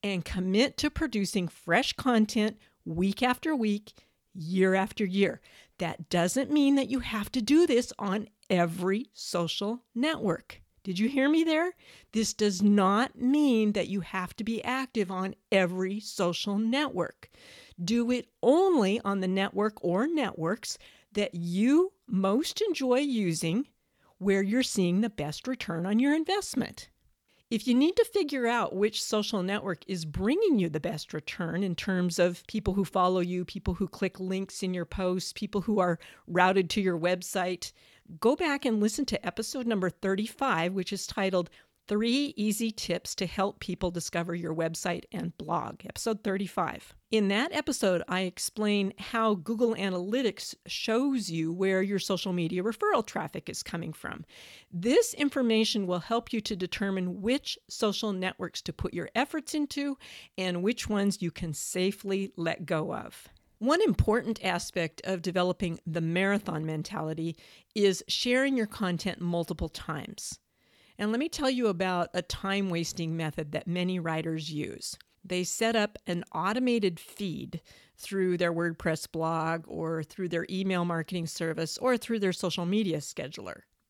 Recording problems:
none

